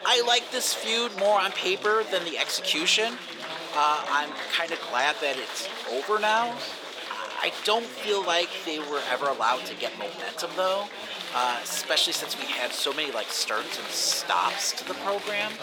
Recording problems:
thin; somewhat; fading below 550 Hz
murmuring crowd; loud; throughout; 8 dB below the speech

